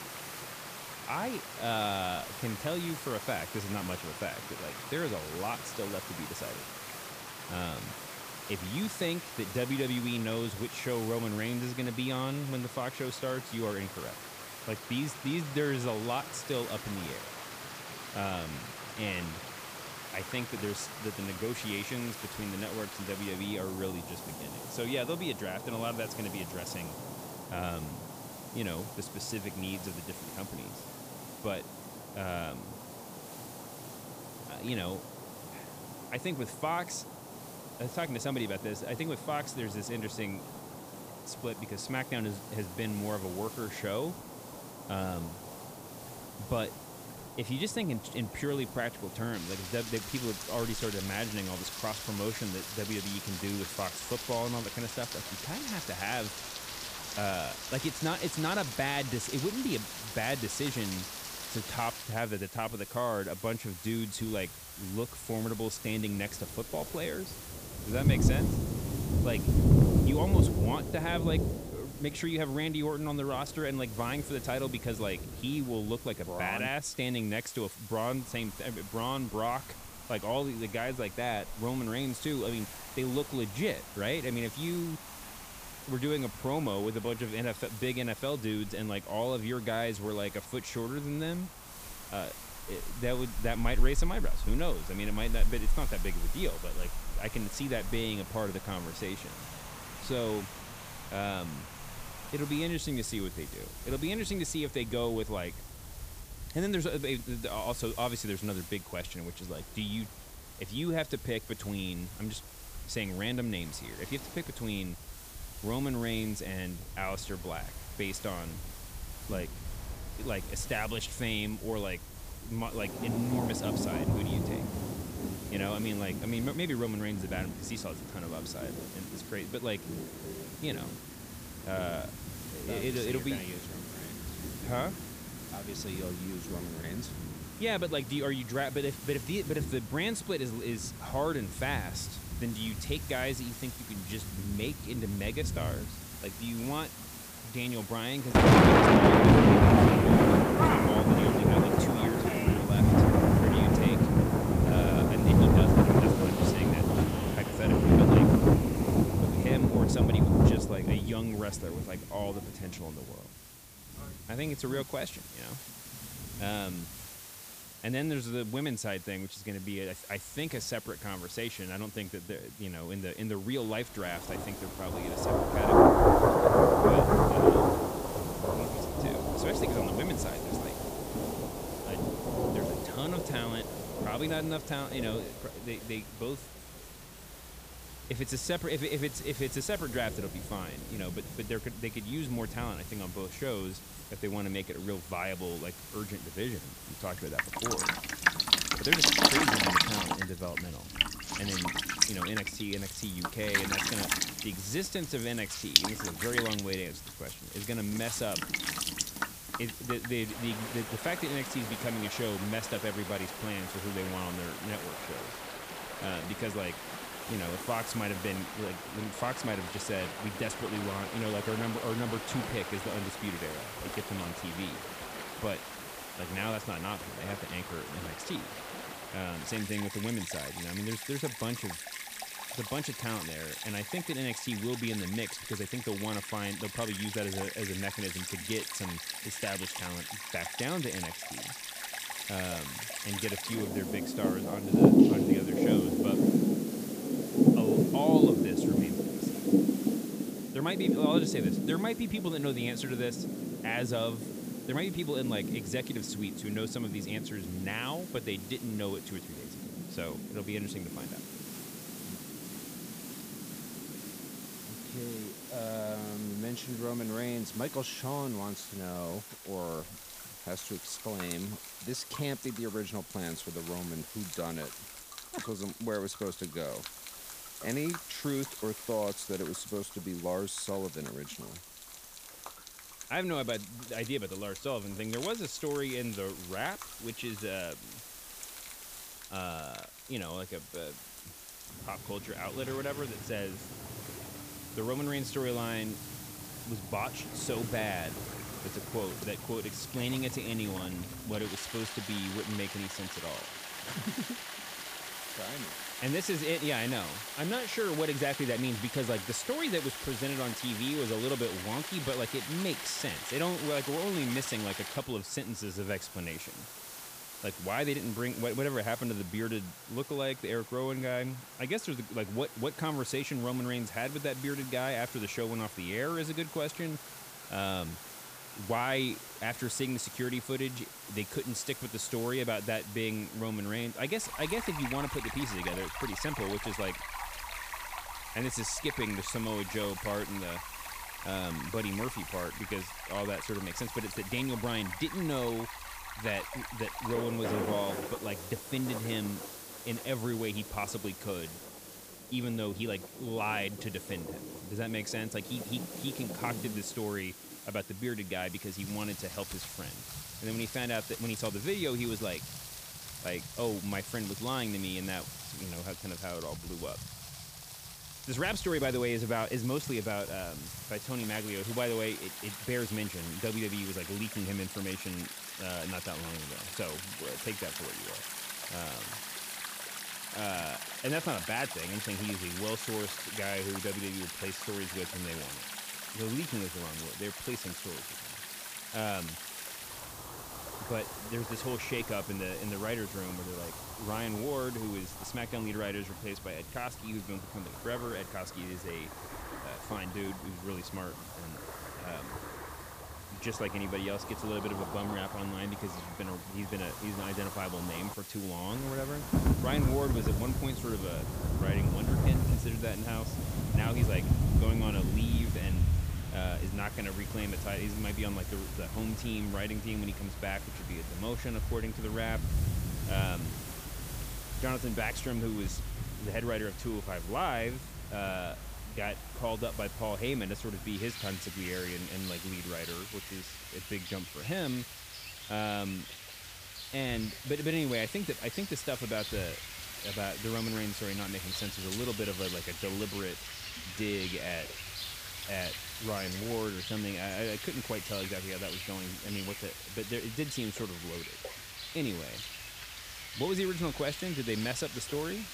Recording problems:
rain or running water; very loud; throughout; 4 dB above the speech
hiss; loud; throughout; 10 dB below the speech

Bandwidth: 15 kHz